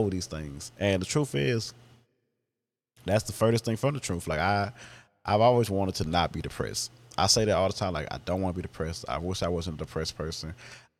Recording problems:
abrupt cut into speech; at the start

